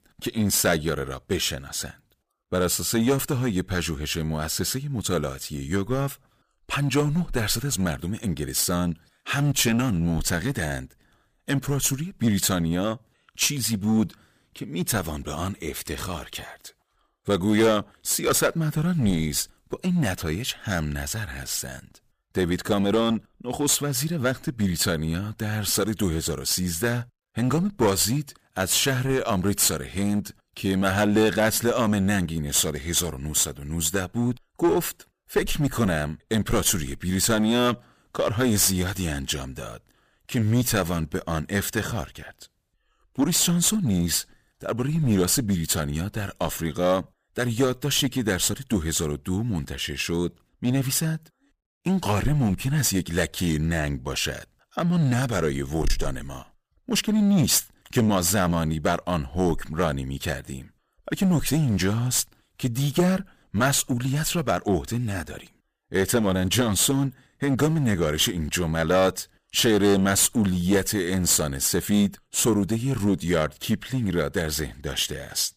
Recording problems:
distortion; slight; 5% of the sound clipped

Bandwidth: 15 kHz